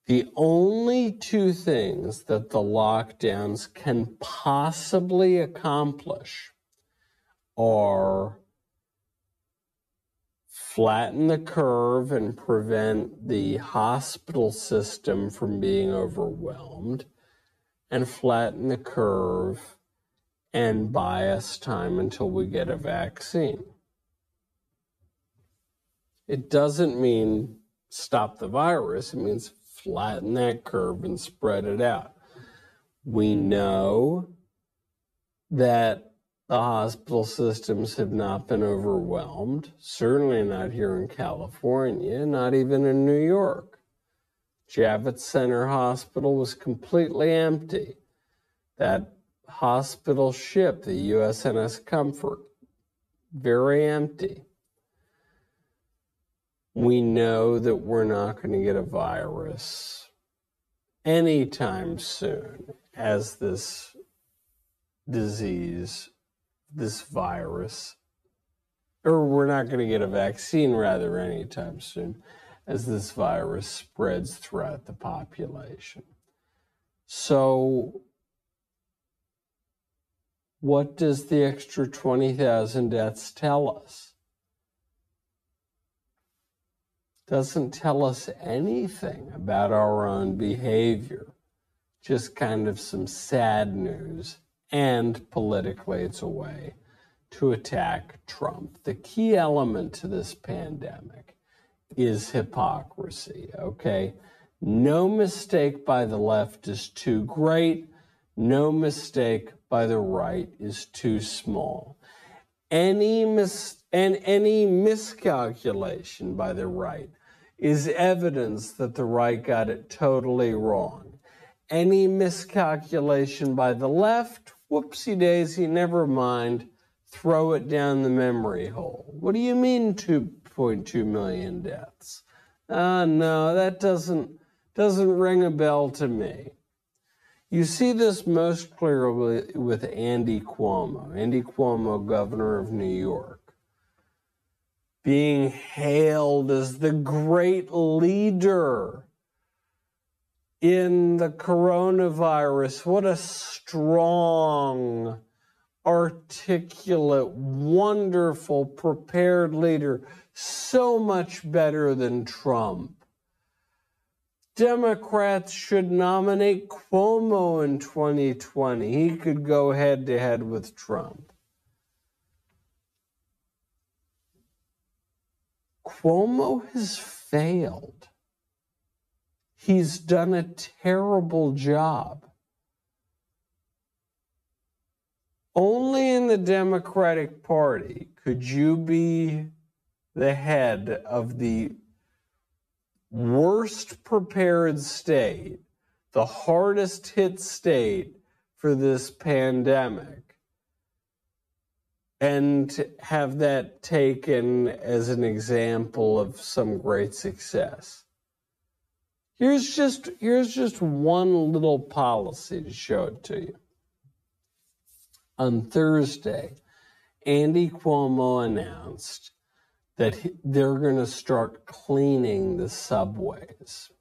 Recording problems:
wrong speed, natural pitch; too slow; 0.5 times normal speed

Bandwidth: 14.5 kHz